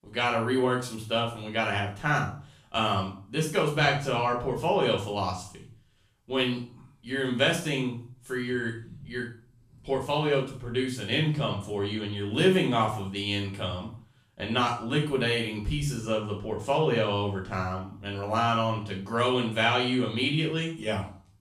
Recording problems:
off-mic speech; far
room echo; noticeable; dies away in 0.5 s

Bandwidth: 14 kHz